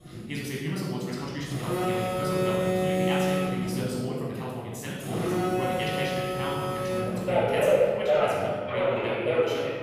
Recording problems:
room echo; strong; dies away in 1.4 s
off-mic speech; far
wrong speed, natural pitch; too fast; 1.7 times normal speed
alarms or sirens; very loud; throughout; 6 dB above the speech
electrical hum; faint; from 1 to 4 s and from 5.5 to 8 s; 60 Hz, 20 dB below the speech

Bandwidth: 15 kHz